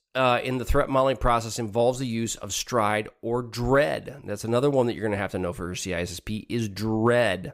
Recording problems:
none

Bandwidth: 15.5 kHz